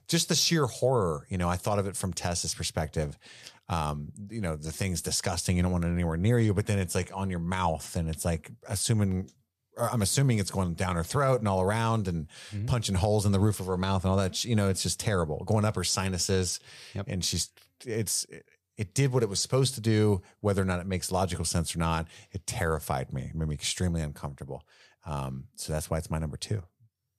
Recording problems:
none

